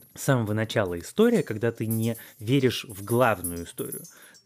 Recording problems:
household noises; noticeable; throughout; 15 dB below the speech

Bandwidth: 15 kHz